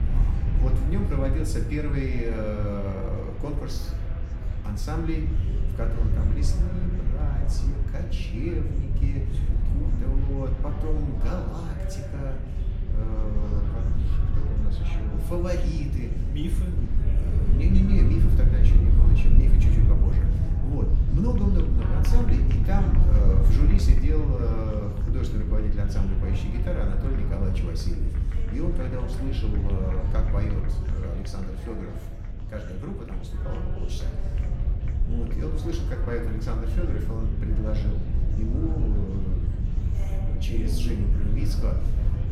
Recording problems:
room echo; slight; dies away in 0.6 s
off-mic speech; somewhat distant
wind noise on the microphone; heavy; 5 dB below the speech
murmuring crowd; noticeable; throughout; 10 dB below the speech

